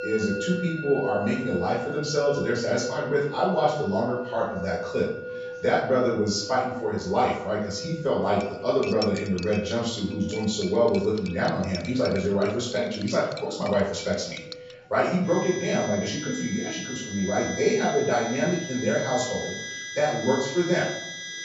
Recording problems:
off-mic speech; far
room echo; noticeable; dies away in 0.6 s
high frequencies cut off; noticeable; nothing above 8 kHz
background music; noticeable; throughout; 10 dB below the speech
chatter from many people; faint; throughout; 30 dB below the speech
clattering dishes; noticeable; from 8.5 to 15 s; peak 8 dB below the speech

